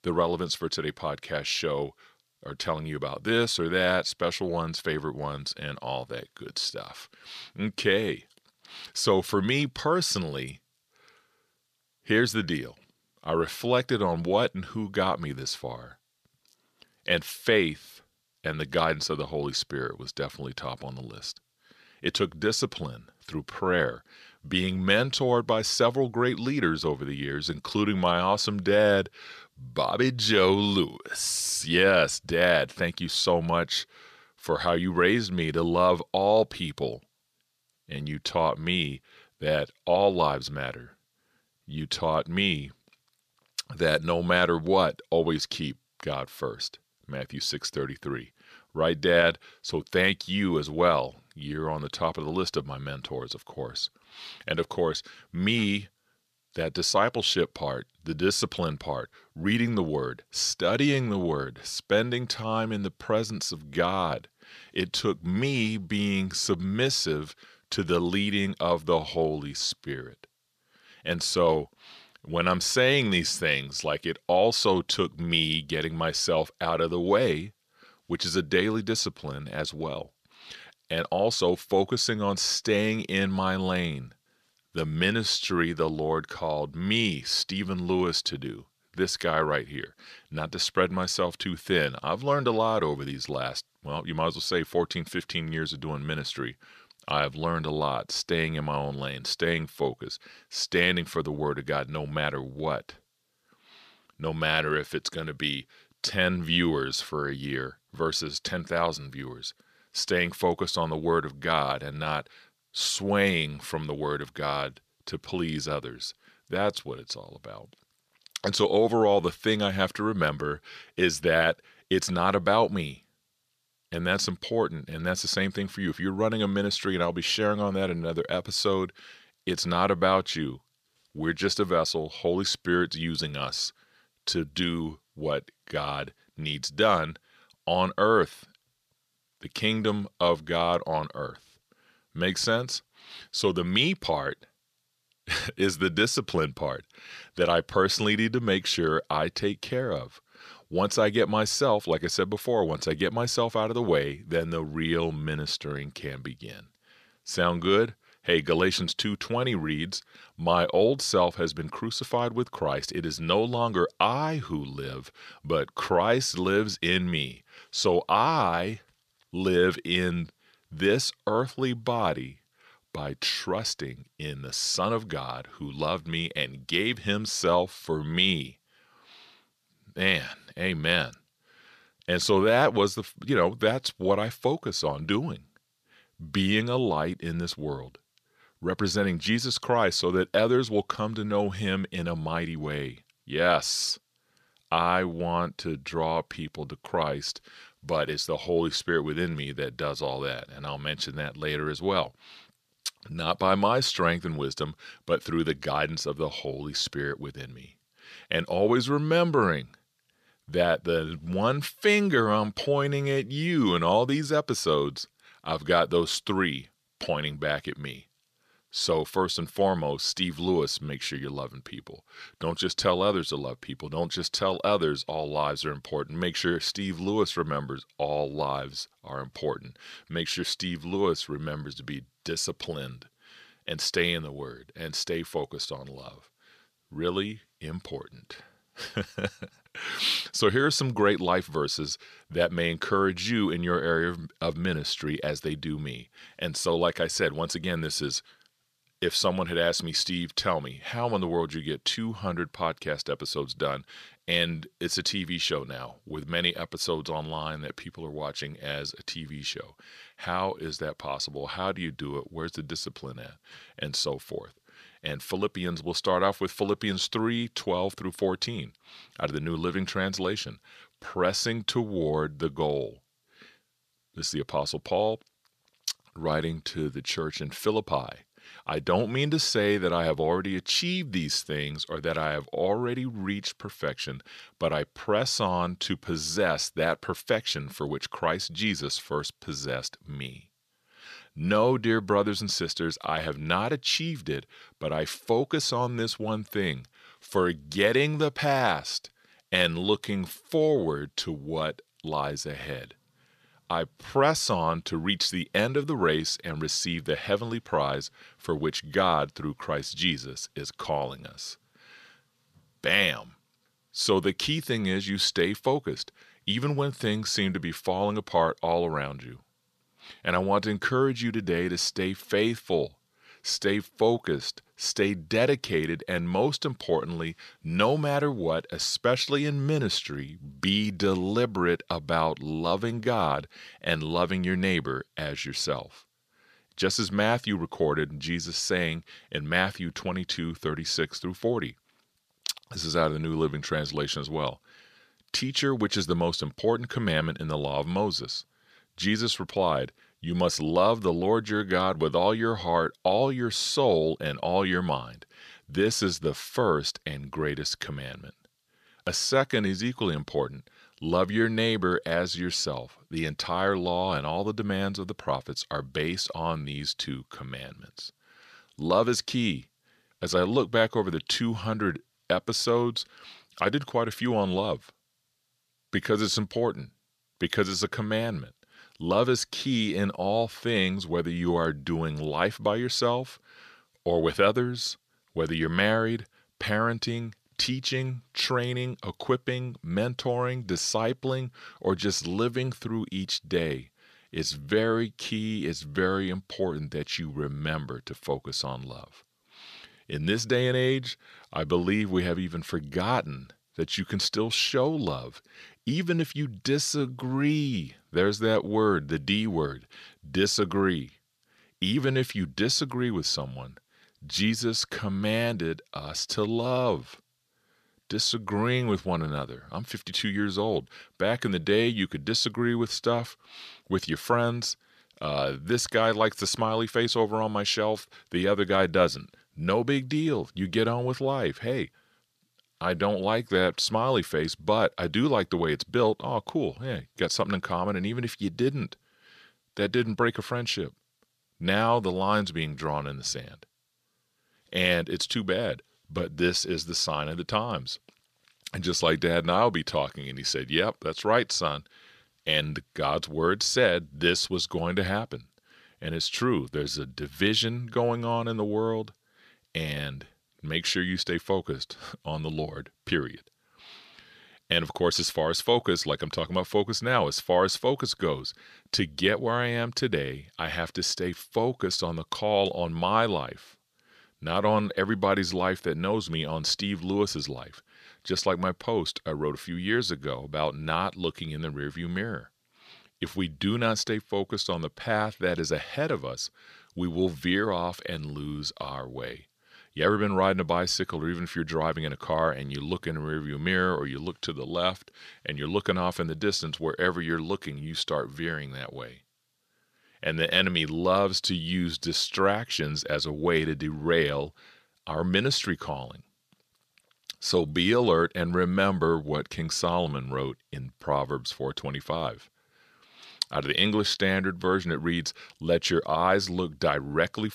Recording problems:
thin; somewhat; fading below 450 Hz

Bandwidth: 14.5 kHz